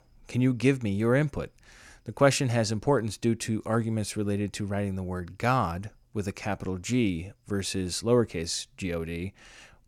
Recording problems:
none

